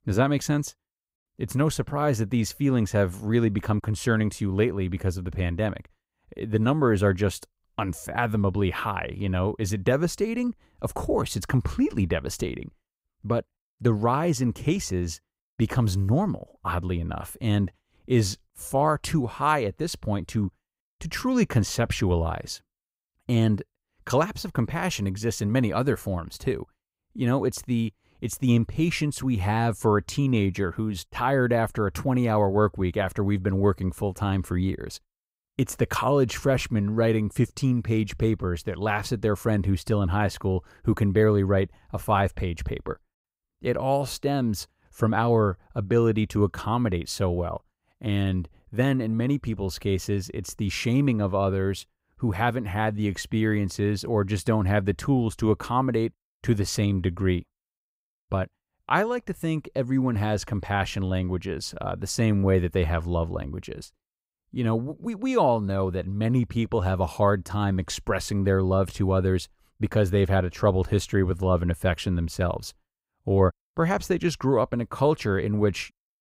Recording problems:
none

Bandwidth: 15.5 kHz